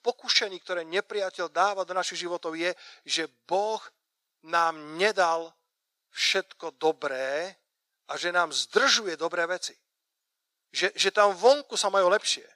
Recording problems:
thin; very; fading below 600 Hz

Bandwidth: 15 kHz